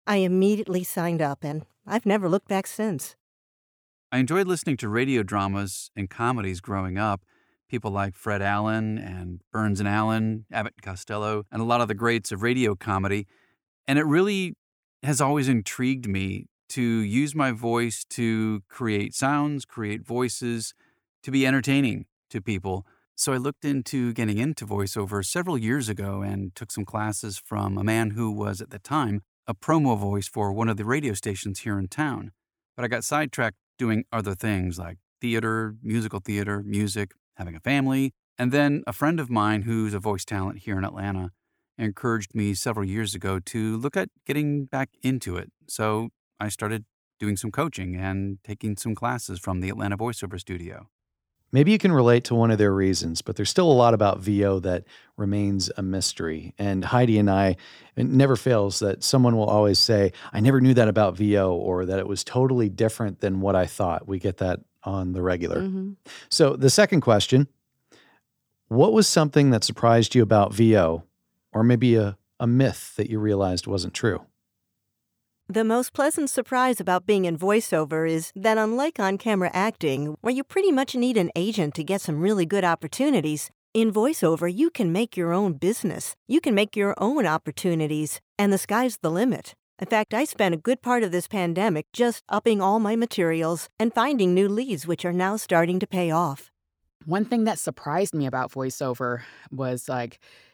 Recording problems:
none

